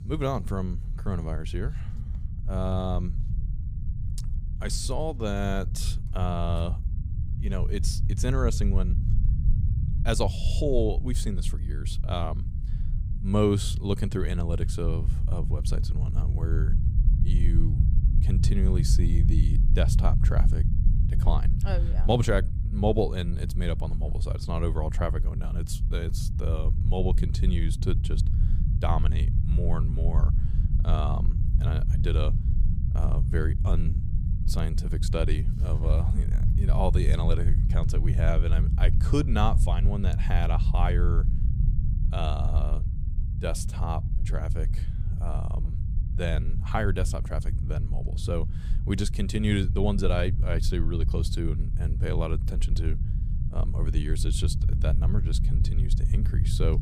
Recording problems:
low rumble; loud; throughout; 9 dB below the speech

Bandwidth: 15 kHz